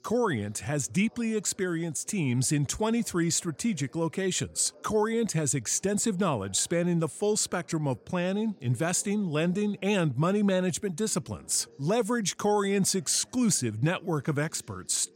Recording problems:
background chatter; faint; throughout; 2 voices, 30 dB below the speech

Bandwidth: 16 kHz